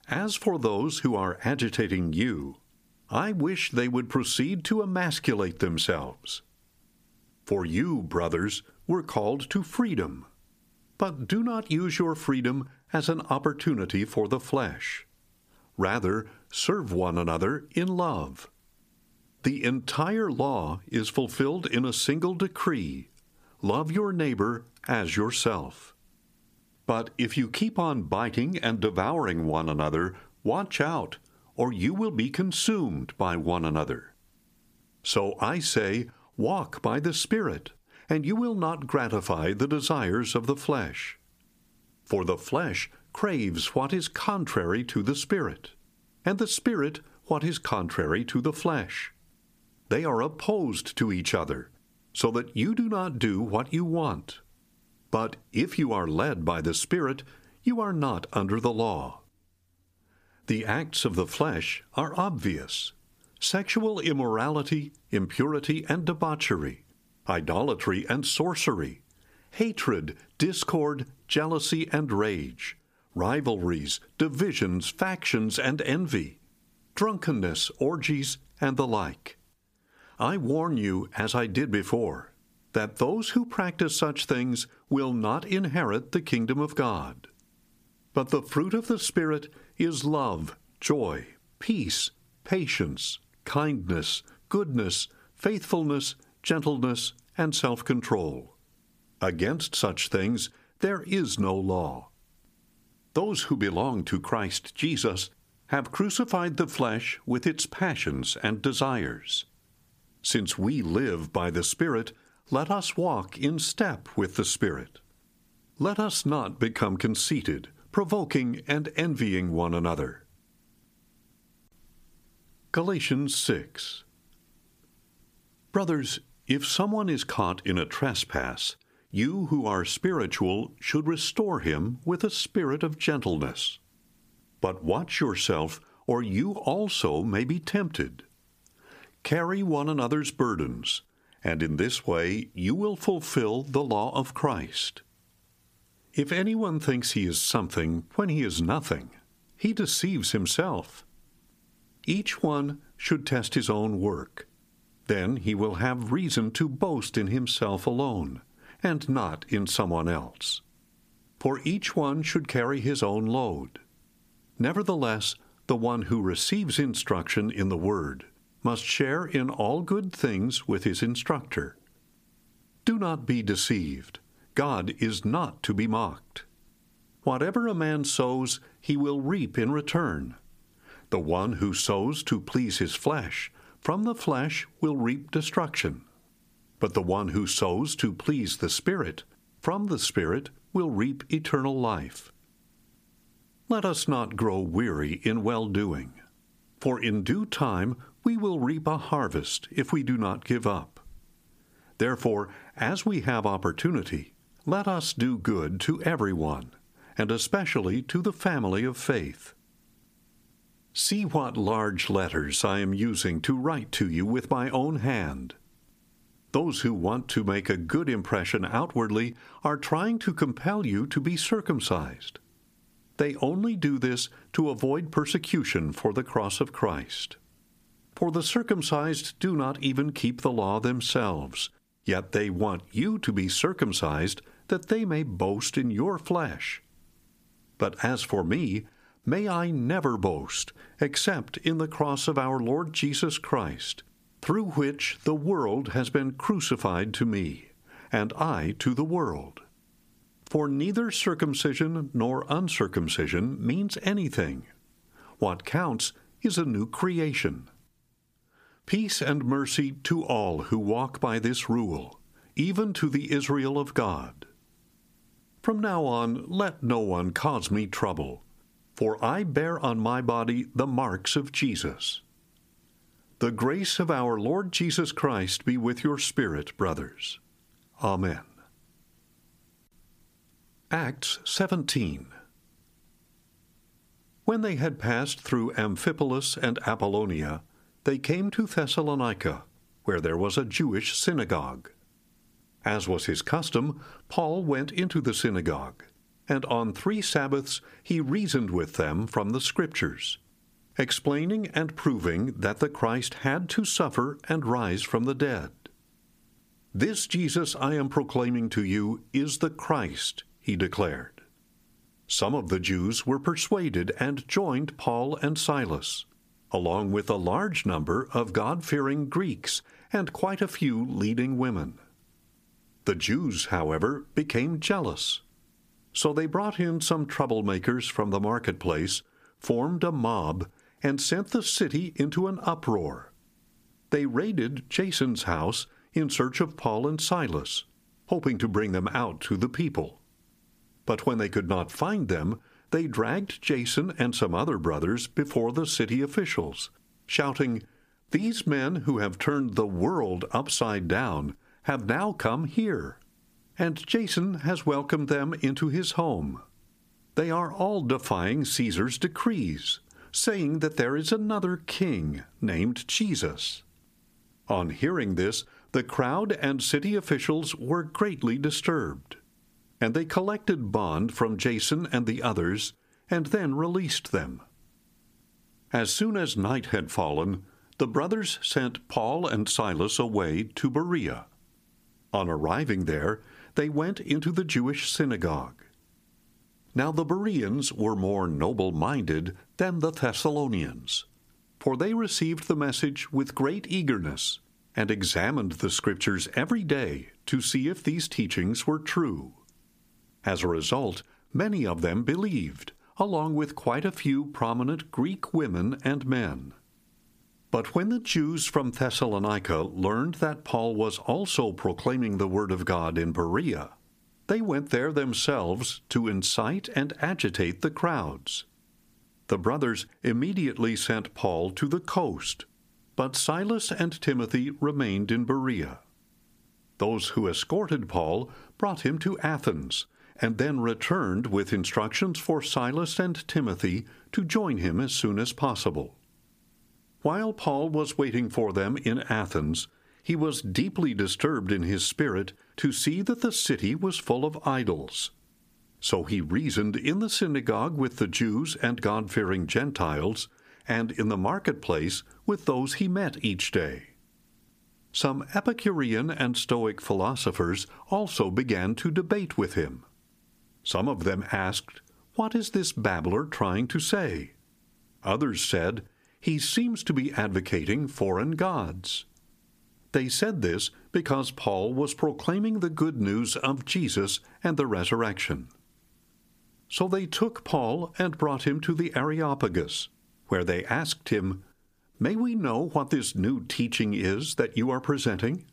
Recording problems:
squashed, flat; somewhat

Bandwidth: 15 kHz